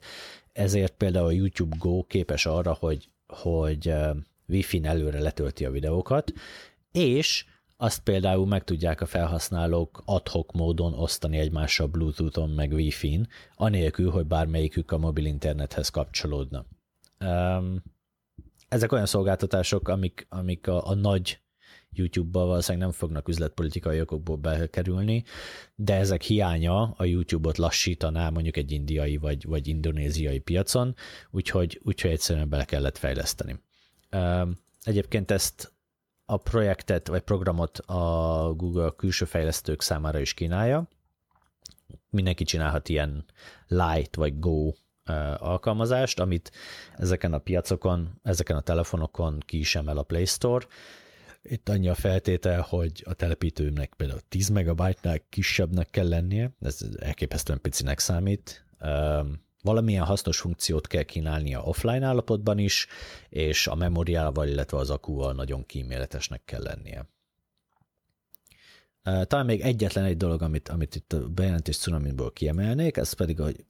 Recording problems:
none

